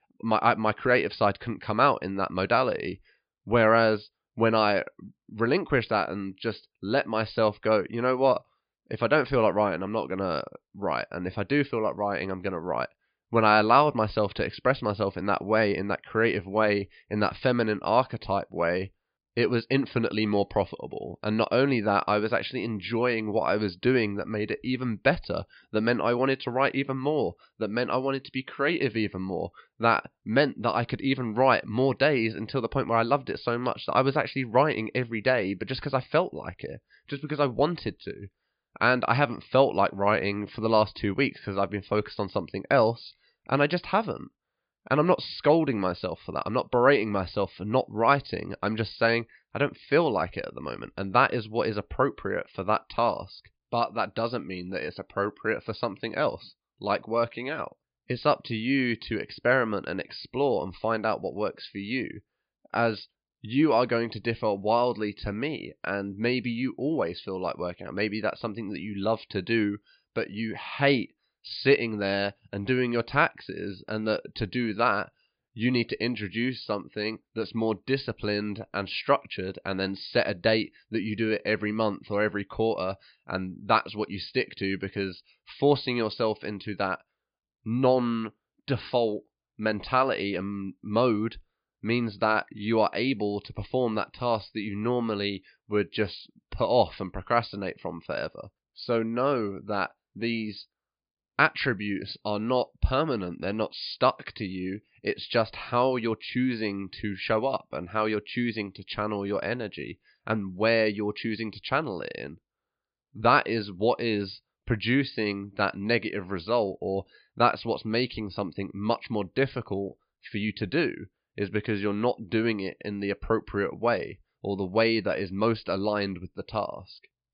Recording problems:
high frequencies cut off; severe; nothing above 5 kHz

